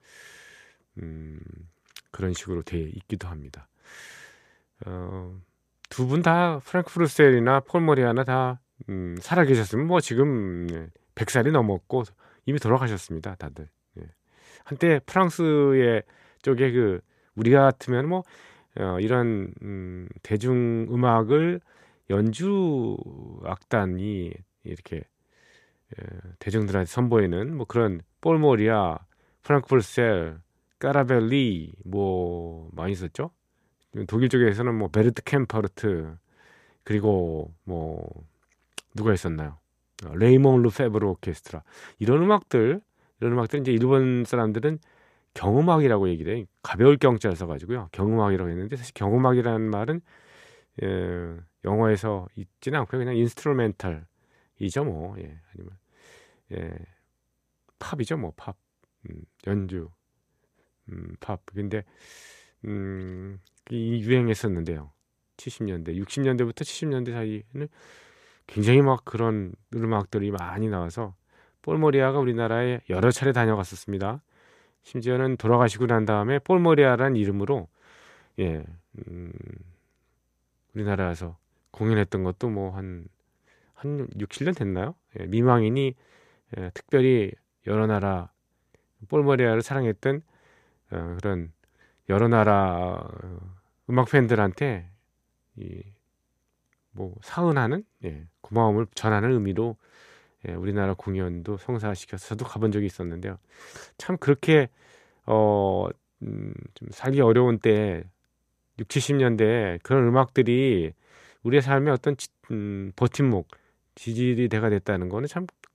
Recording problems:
none

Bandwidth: 14.5 kHz